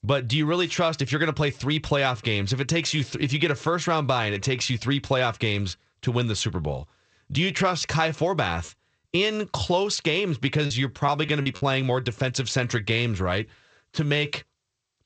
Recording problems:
garbled, watery; slightly; nothing above 8 kHz
choppy; occasionally; from 8.5 to 12 s; 5% of the speech affected

